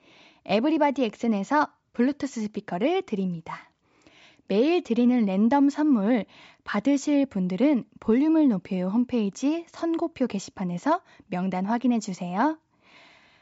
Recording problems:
high frequencies cut off; noticeable; nothing above 8 kHz

